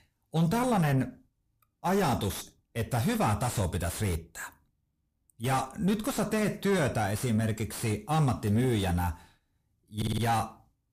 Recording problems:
distortion; heavy; 6 dB below the speech
audio stuttering; at 10 s

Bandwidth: 15 kHz